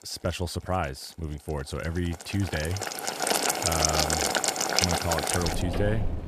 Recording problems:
household noises; very loud; throughout; 5 dB above the speech

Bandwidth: 14.5 kHz